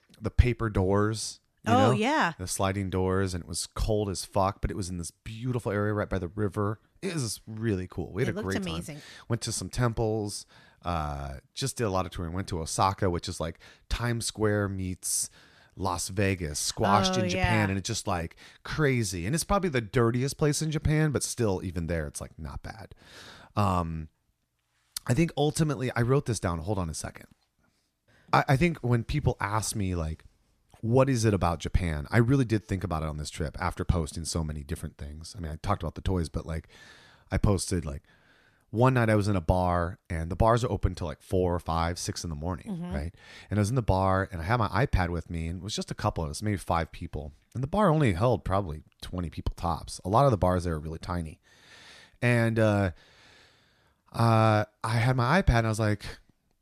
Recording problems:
none

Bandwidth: 14 kHz